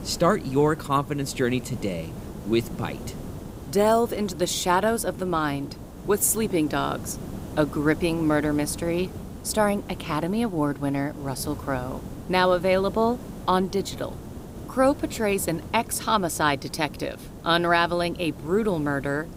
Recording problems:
hiss; noticeable; throughout; 15 dB below the speech

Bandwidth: 15.5 kHz